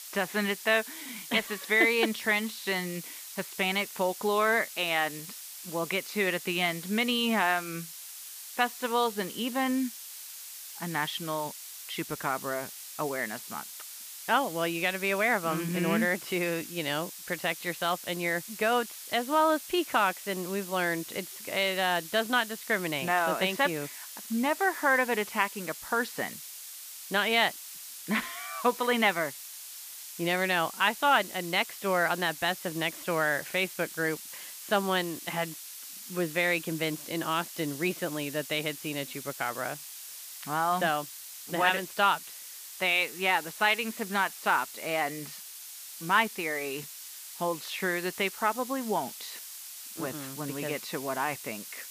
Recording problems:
muffled; slightly; fading above 2.5 kHz
hiss; noticeable; throughout; 10 dB below the speech

